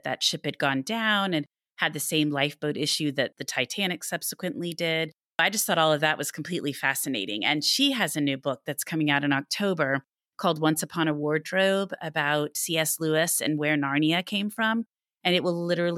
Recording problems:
abrupt cut into speech; at the end

